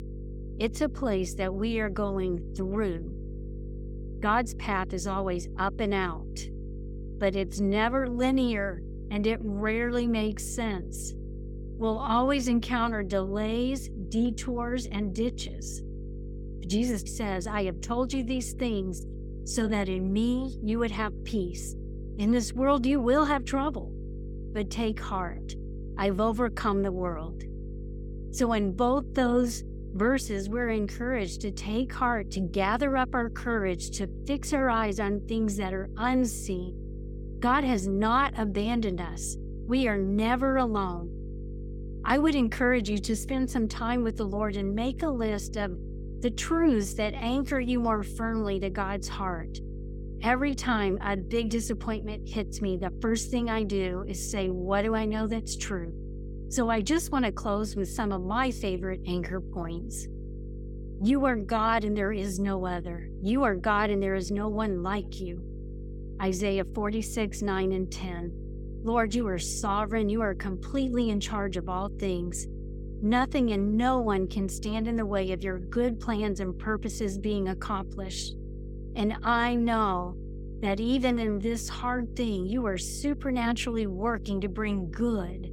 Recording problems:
electrical hum; noticeable; throughout; 50 Hz, 20 dB below the speech

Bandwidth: 17 kHz